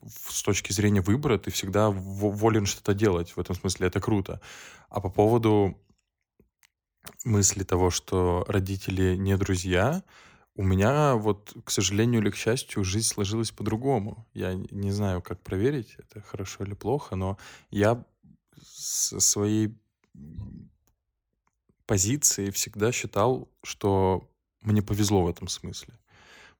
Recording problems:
none

